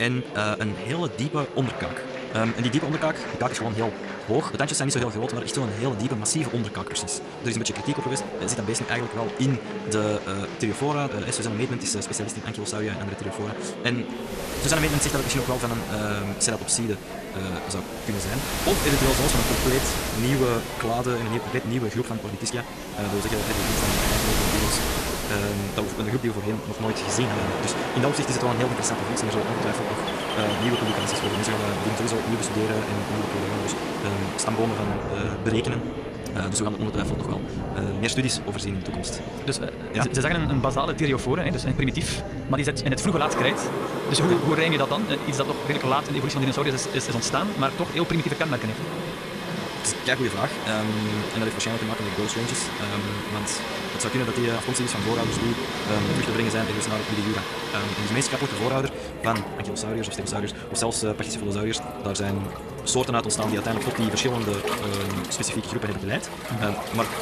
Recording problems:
wrong speed, natural pitch; too fast; 1.8 times normal speed
rain or running water; loud; from 15 s on; 3 dB below the speech
chatter from many people; loud; throughout; 8 dB below the speech
high-pitched whine; faint; throughout; 3 kHz, 30 dB below the speech
abrupt cut into speech; at the start

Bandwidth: 14 kHz